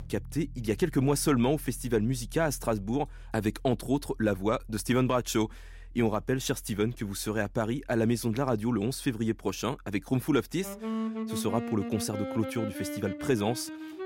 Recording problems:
background music; noticeable; throughout; 10 dB below the speech

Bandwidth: 16 kHz